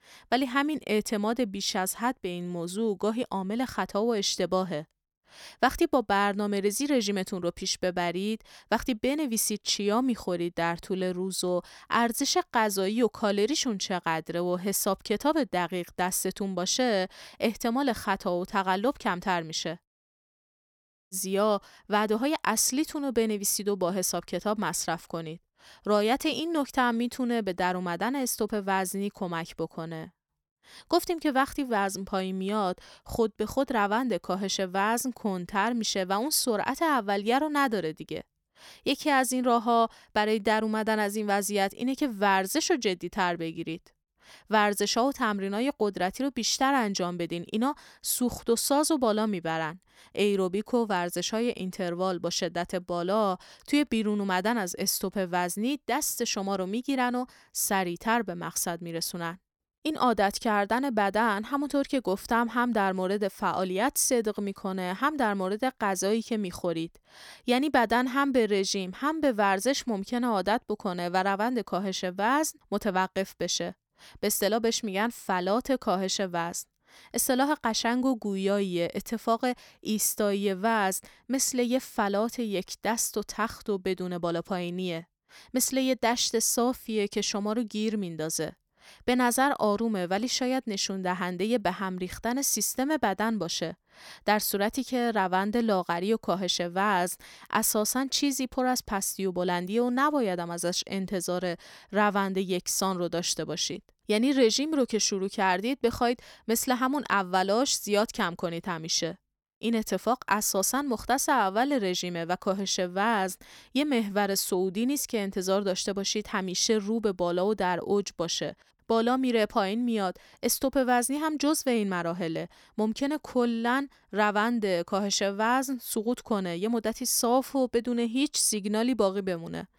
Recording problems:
audio cutting out; at 20 s for 1.5 s

